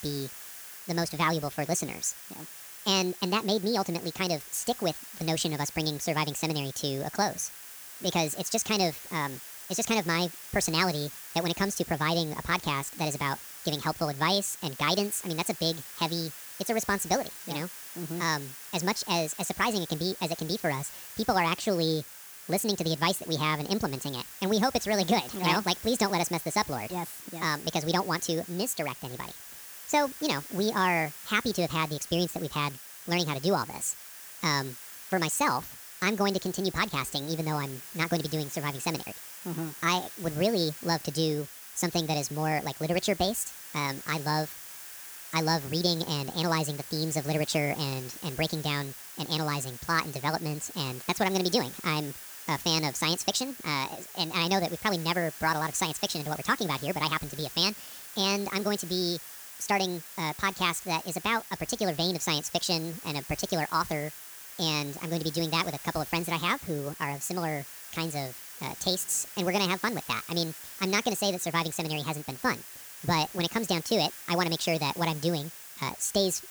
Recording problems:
wrong speed and pitch; too fast and too high; 1.5 times normal speed
hiss; noticeable; throughout; 10 dB below the speech

